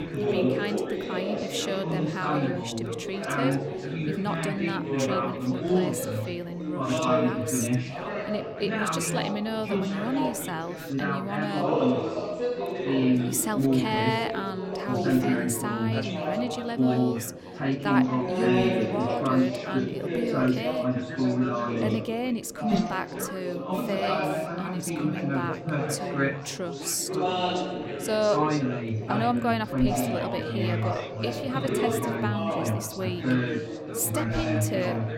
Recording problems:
chatter from many people; very loud; throughout; 4 dB above the speech

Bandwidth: 16.5 kHz